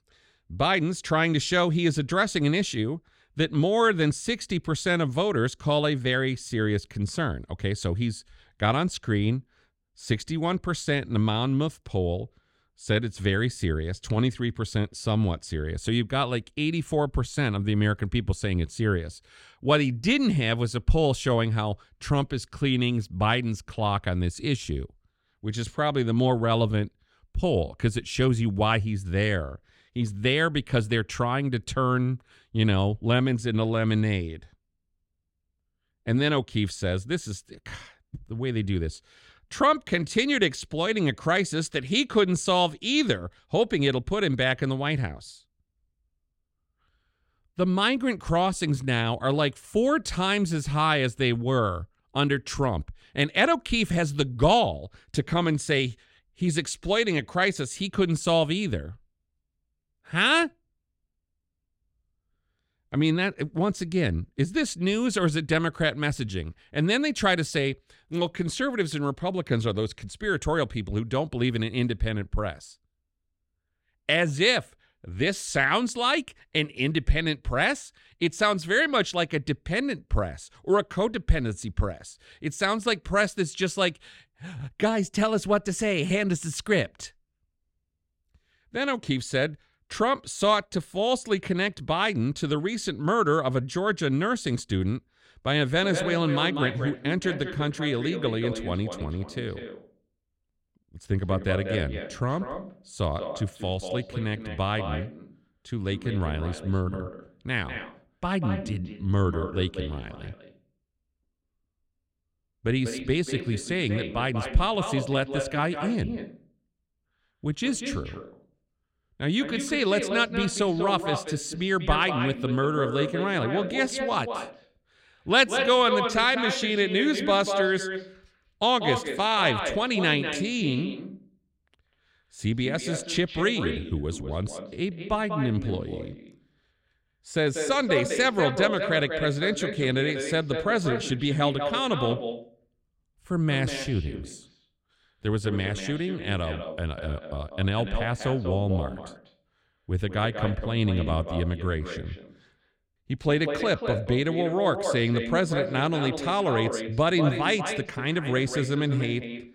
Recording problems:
echo of what is said; strong; from 1:36 on; 190 ms later, 8 dB below the speech

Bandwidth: 16 kHz